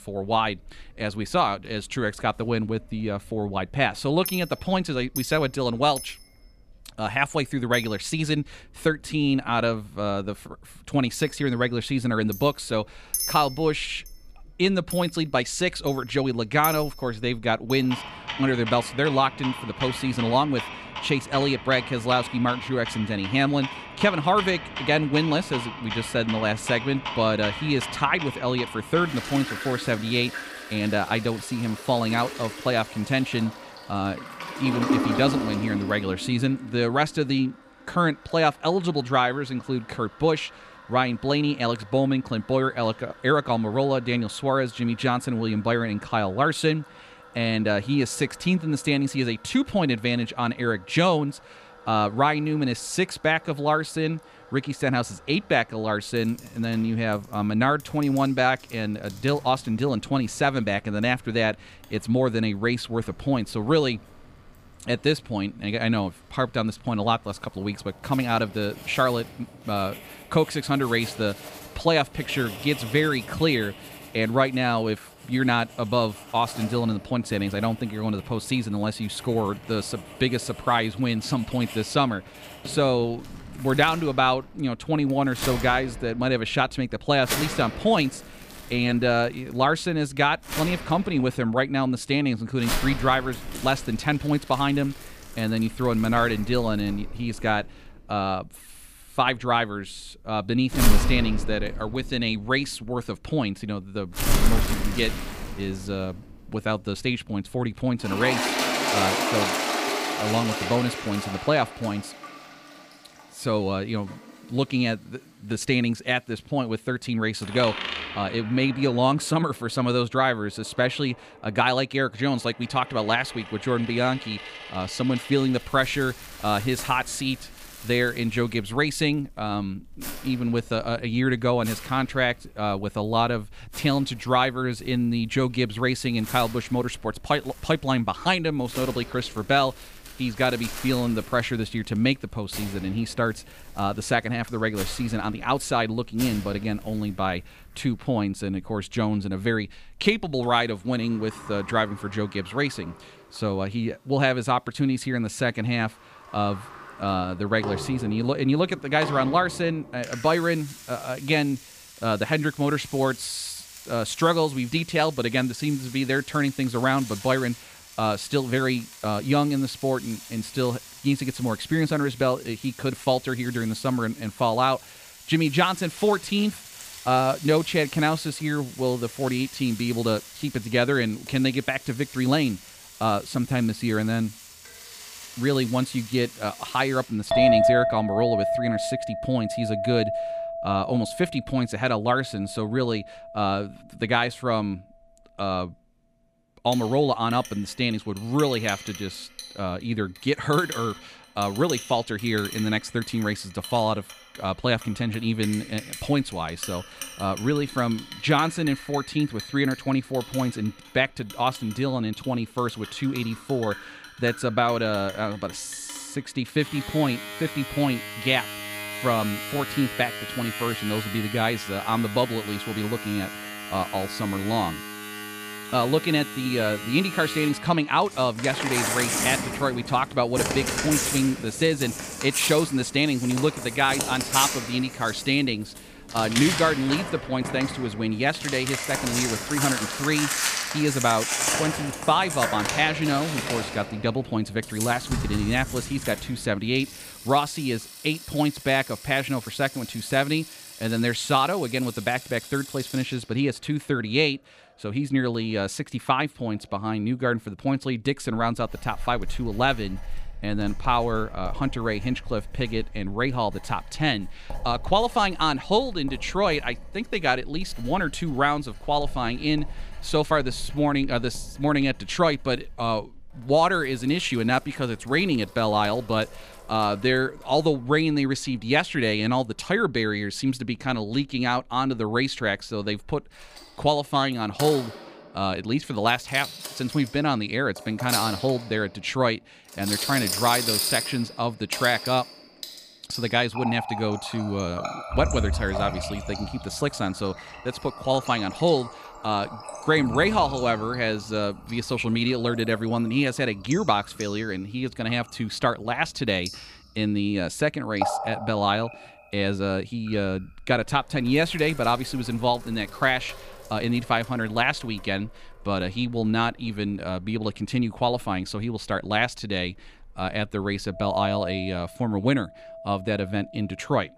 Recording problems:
household noises; loud; throughout; 8 dB below the speech

